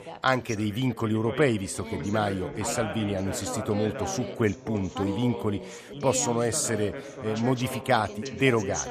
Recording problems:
background chatter; loud; throughout; 2 voices, 8 dB below the speech

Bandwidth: 14.5 kHz